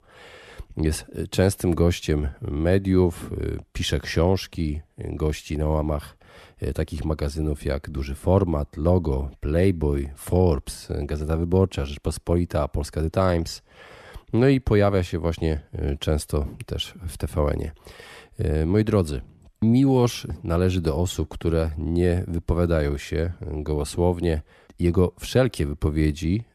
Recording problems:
none

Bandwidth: 14 kHz